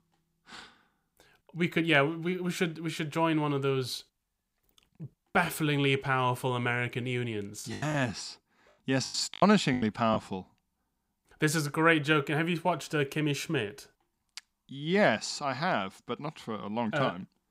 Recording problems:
choppy; very; from 7.5 to 10 s; 15% of the speech affected

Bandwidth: 15.5 kHz